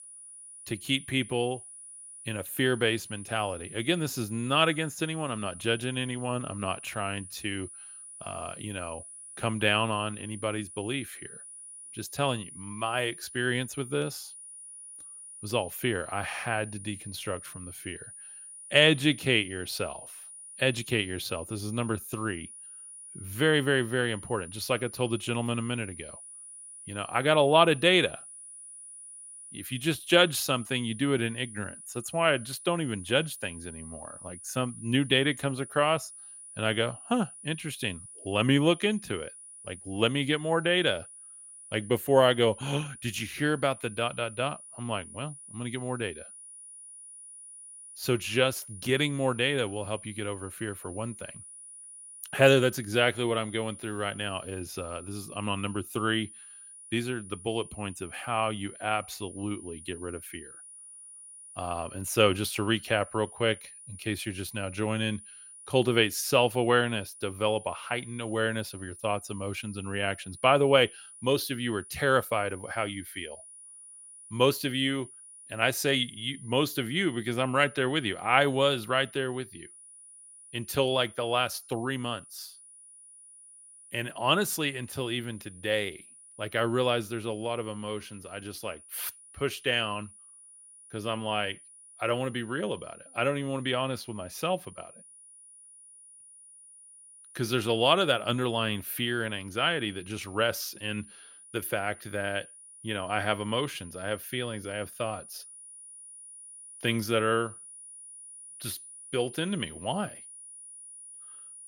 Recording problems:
high-pitched whine; noticeable; throughout; 9.5 kHz, 15 dB below the speech

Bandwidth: 16 kHz